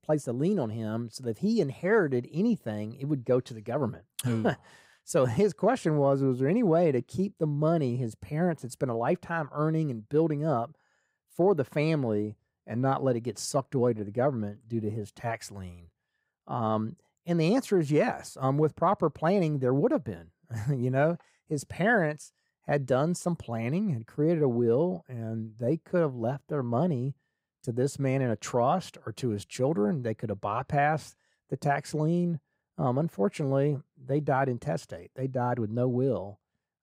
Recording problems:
none

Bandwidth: 15.5 kHz